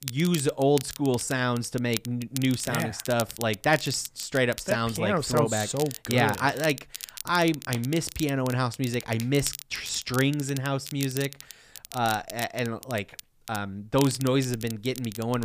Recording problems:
crackle, like an old record; noticeable; 10 dB below the speech
abrupt cut into speech; at the end

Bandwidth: 15 kHz